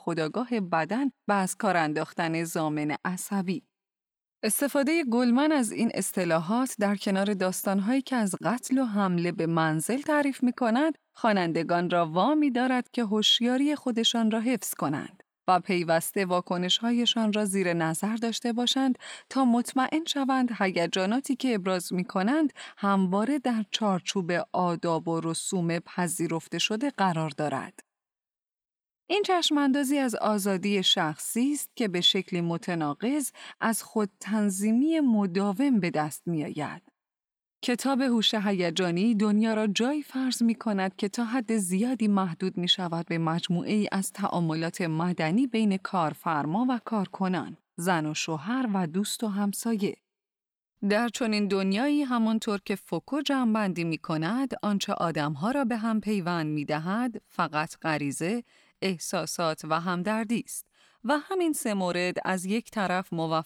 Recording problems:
none

